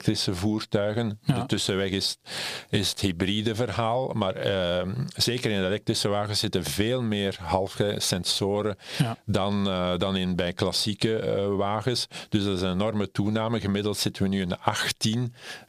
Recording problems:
squashed, flat; somewhat

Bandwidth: 15 kHz